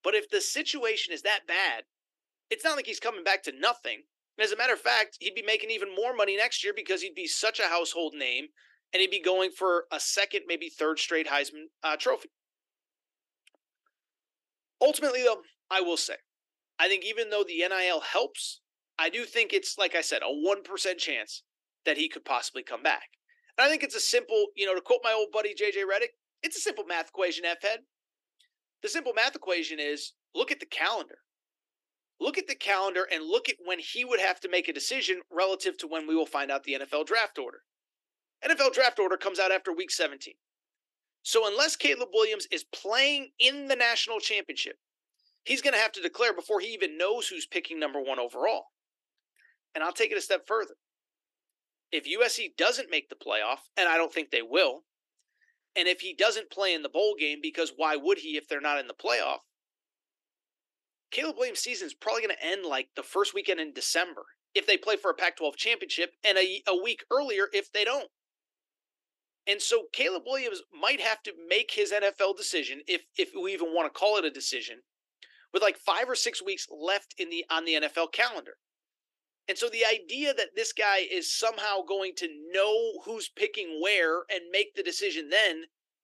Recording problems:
thin; somewhat; fading below 300 Hz

